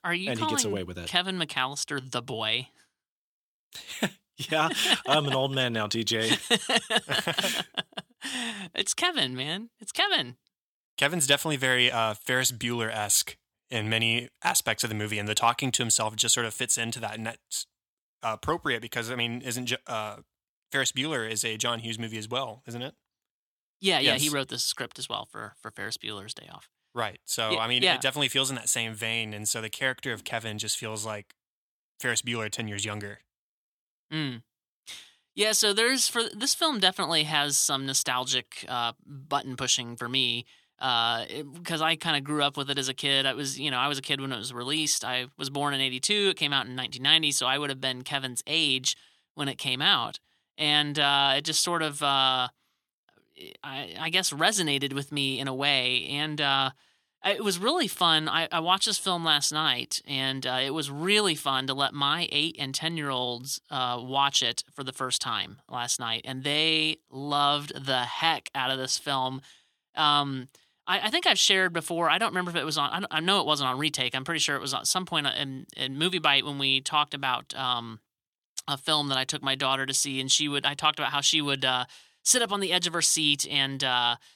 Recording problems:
thin; somewhat; fading below 450 Hz

